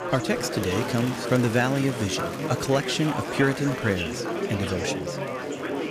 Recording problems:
chatter from many people; loud; throughout; 4 dB below the speech

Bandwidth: 15 kHz